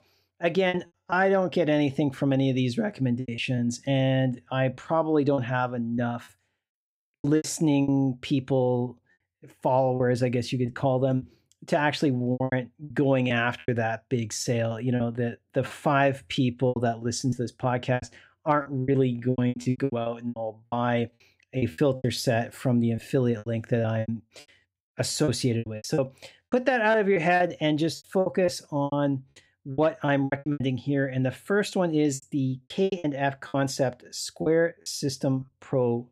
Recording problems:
choppy; very; 13% of the speech affected

